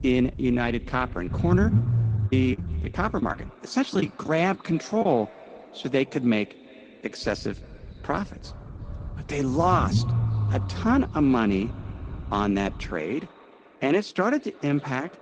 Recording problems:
echo of what is said; faint; throughout; 350 ms later, 20 dB below the speech
garbled, watery; slightly; nothing above 8 kHz
low rumble; noticeable; until 3.5 s and from 7 to 13 s; 15 dB below the speech
choppy; very; from 2.5 to 5 s; 16% of the speech affected

